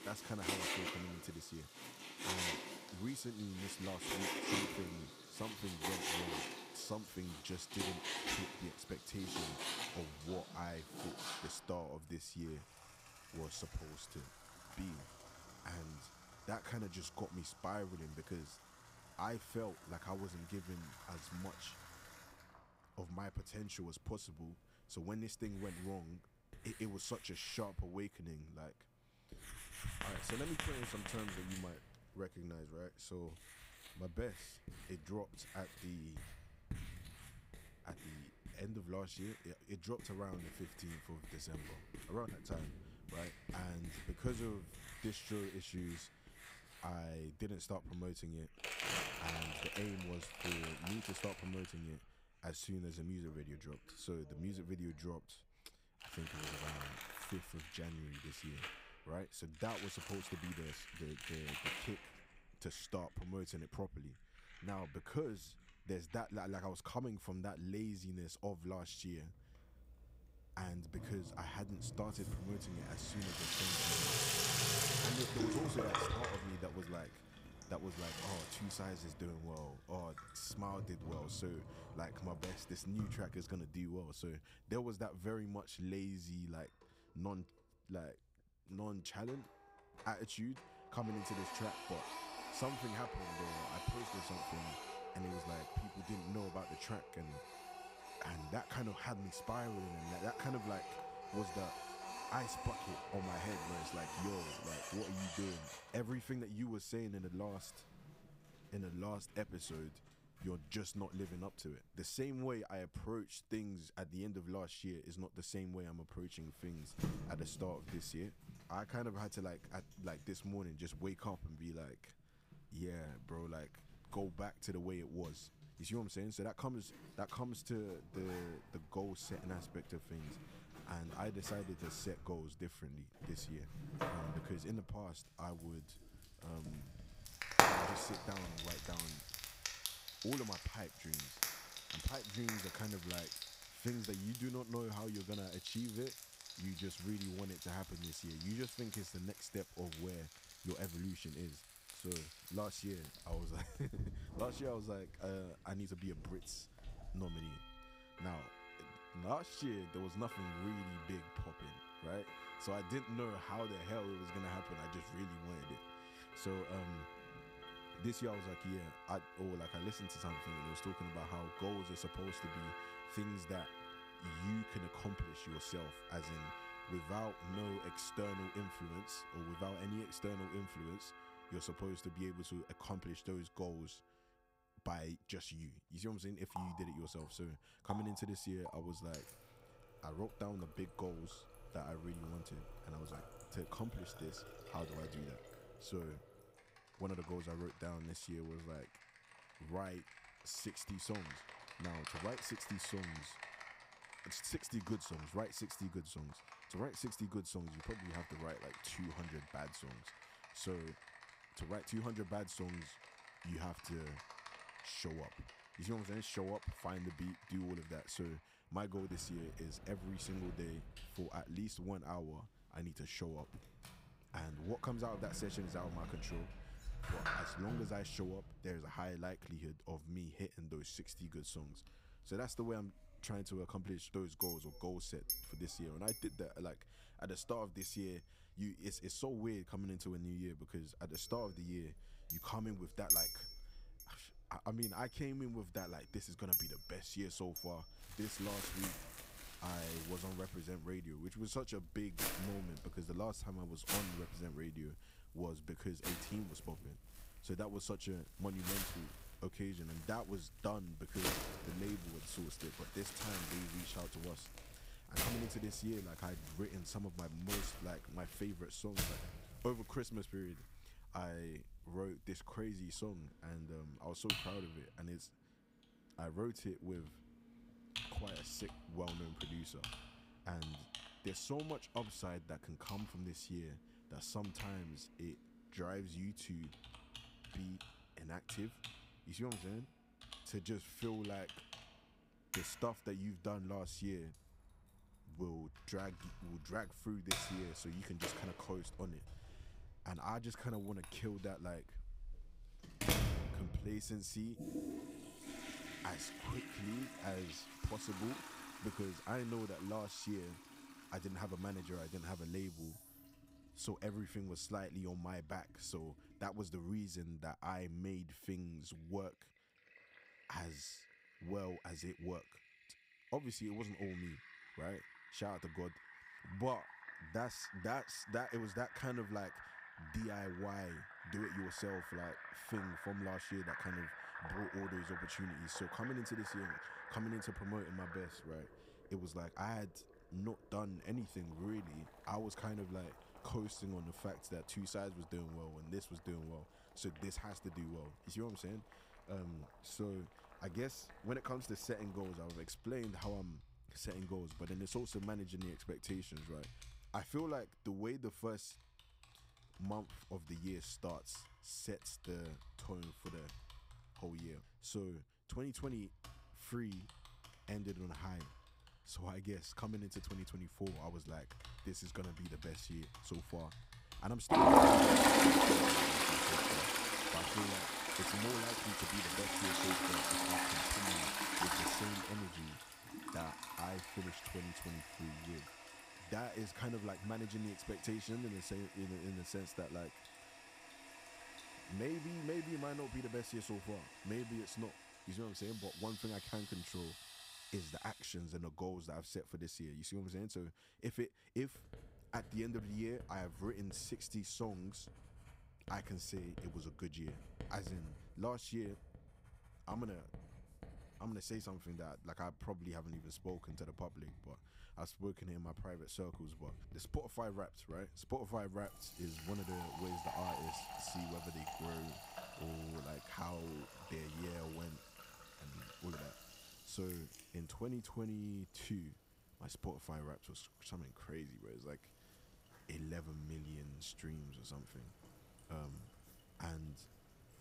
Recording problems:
household noises; very loud; throughout; 4 dB above the speech

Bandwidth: 15.5 kHz